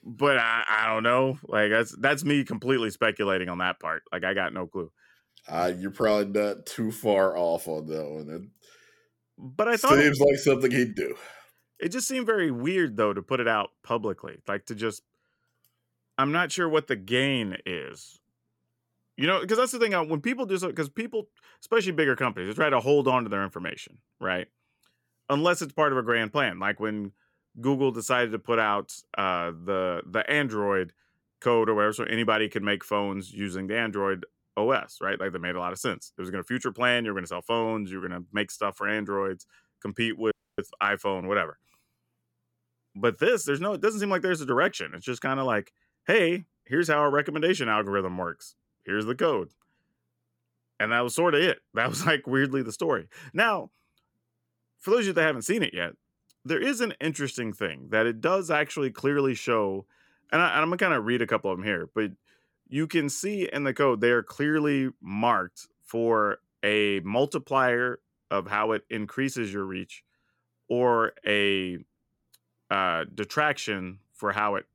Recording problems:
audio cutting out; at 40 s

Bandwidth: 17.5 kHz